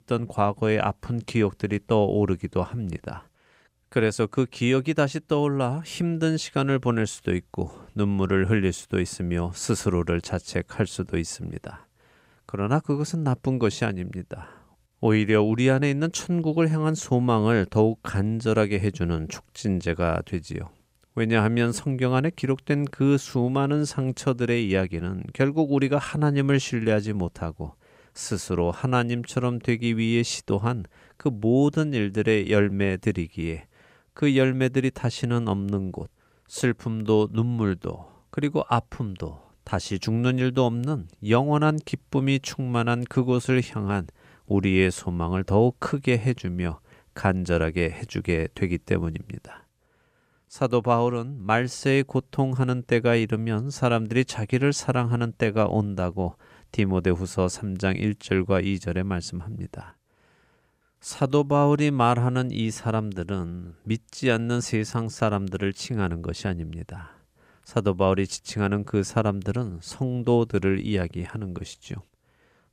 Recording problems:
none

